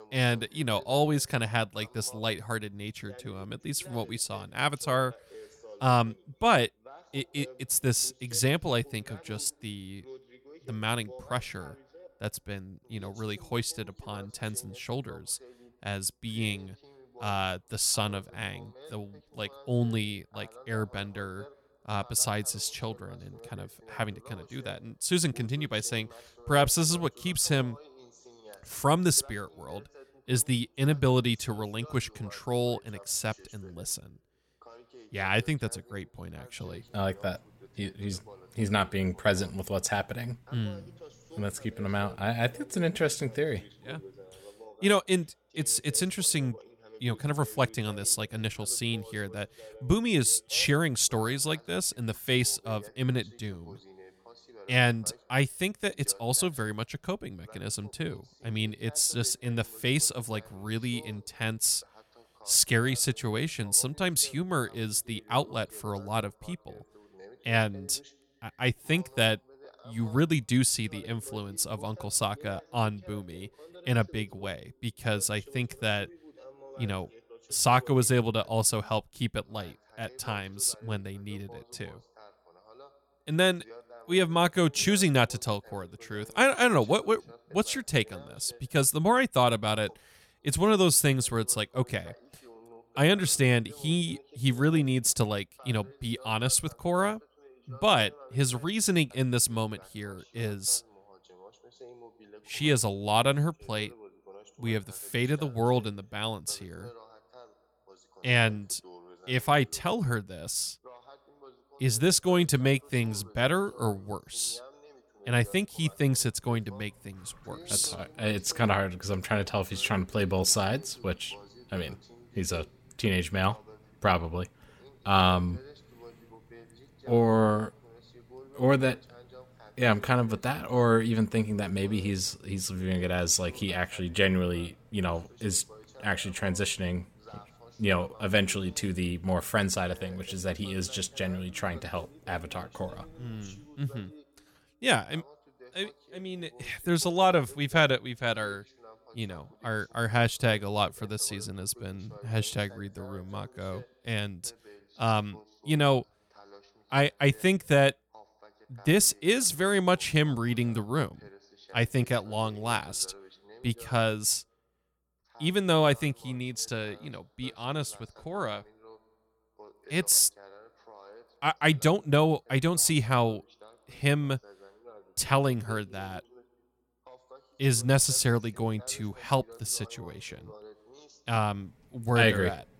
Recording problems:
voice in the background; faint; throughout; 25 dB below the speech

